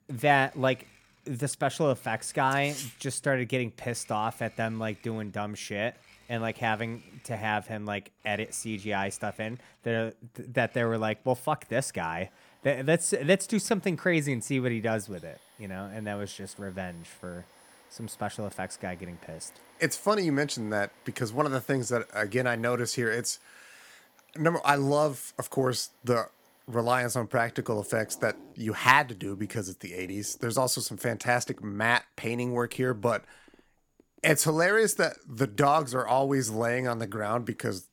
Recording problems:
household noises; faint; throughout; 30 dB below the speech

